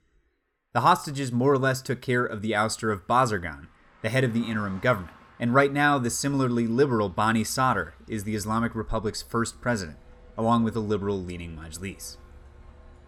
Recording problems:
traffic noise; faint; throughout; 30 dB below the speech

